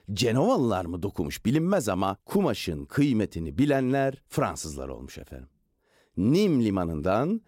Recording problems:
none

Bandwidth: 16 kHz